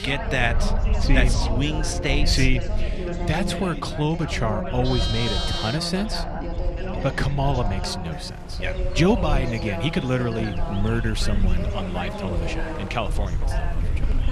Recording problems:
background chatter; loud; throughout; 3 voices, 7 dB below the speech
animal sounds; noticeable; throughout; 10 dB below the speech
low rumble; faint; throughout; 20 dB below the speech

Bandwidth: 14 kHz